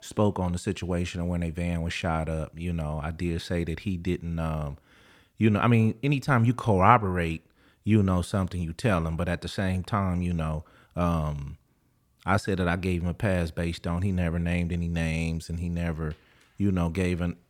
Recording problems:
none

